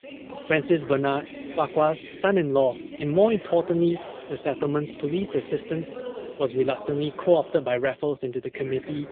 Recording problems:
phone-call audio; poor line
voice in the background; noticeable; throughout; 15 dB below the speech

